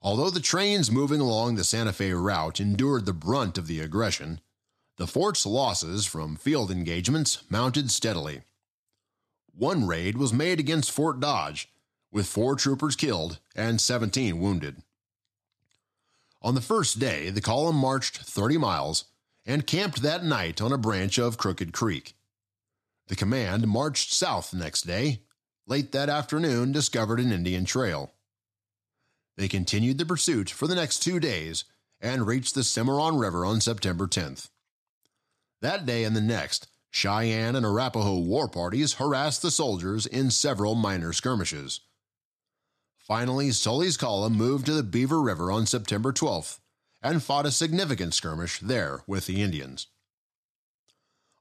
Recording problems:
none

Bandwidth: 13.5 kHz